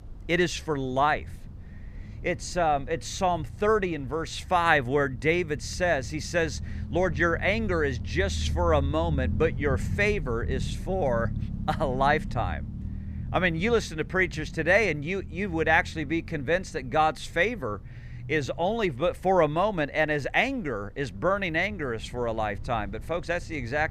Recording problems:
low rumble; faint; throughout; 25 dB below the speech

